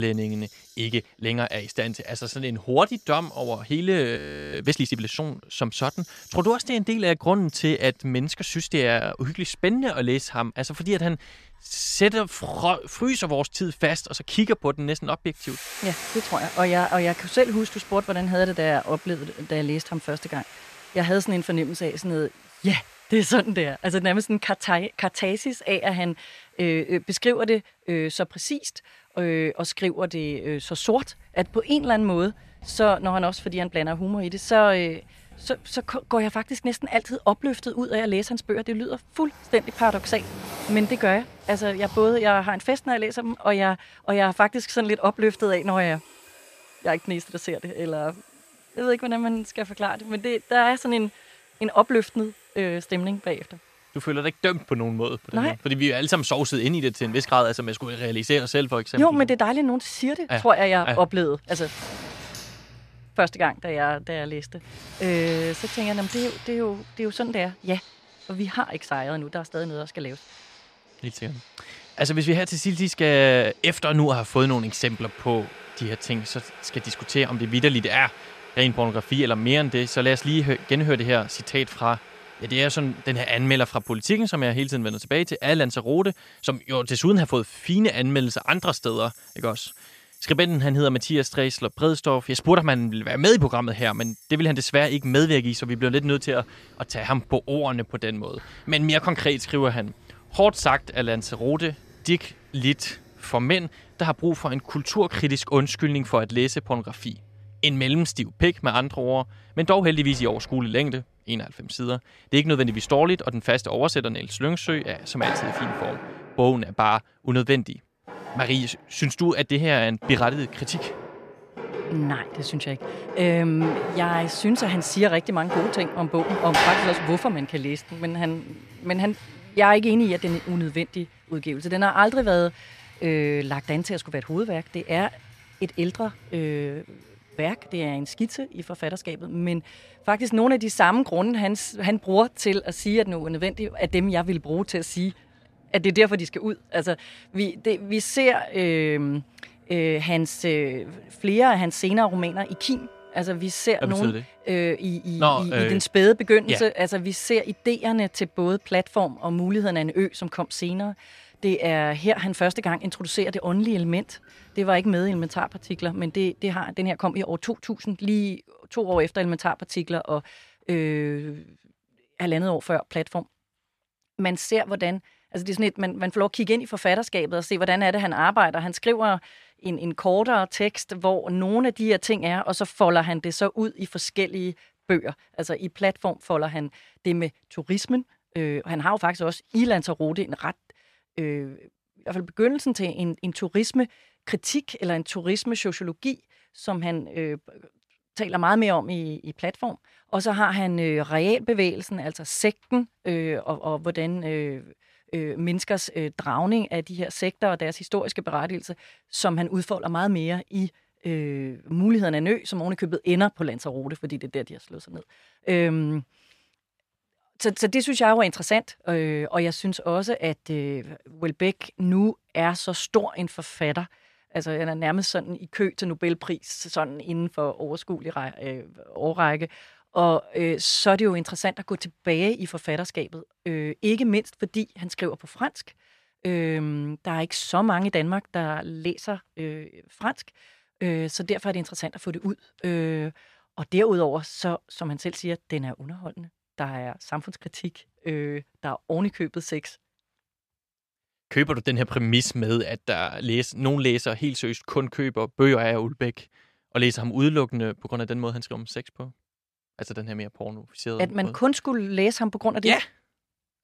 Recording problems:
household noises; noticeable; until 2:46; 15 dB below the speech
abrupt cut into speech; at the start
audio freezing; at 4 s

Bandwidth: 14.5 kHz